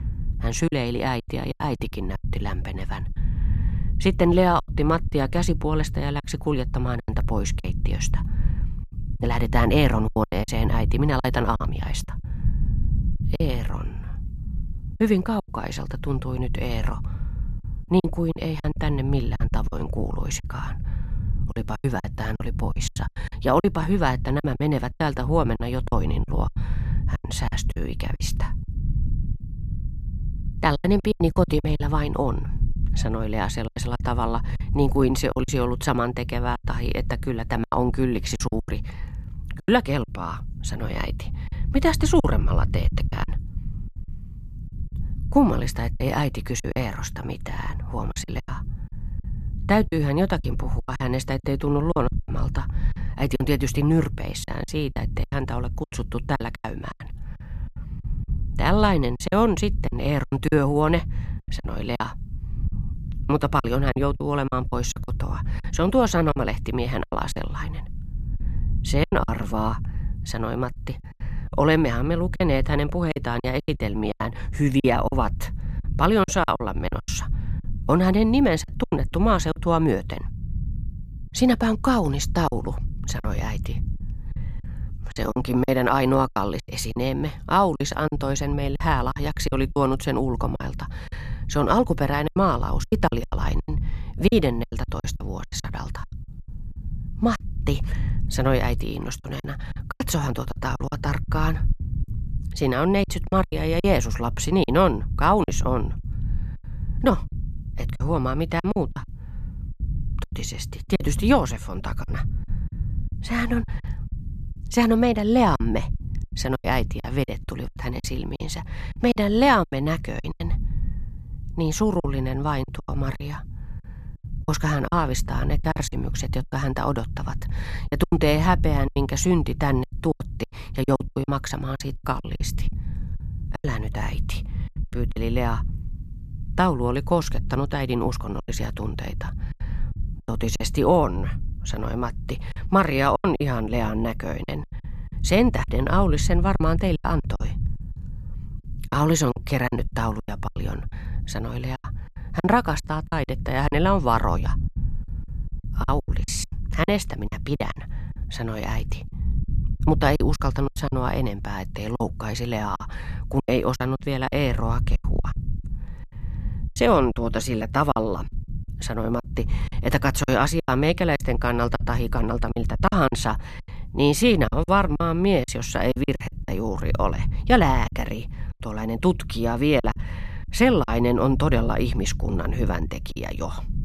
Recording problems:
low rumble; faint; throughout; 20 dB below the speech
choppy; very; 11% of the speech affected

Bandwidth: 14 kHz